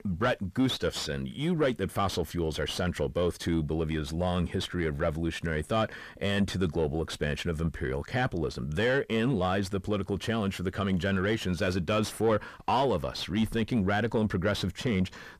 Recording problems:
distortion; slight; 10 dB below the speech

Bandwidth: 14.5 kHz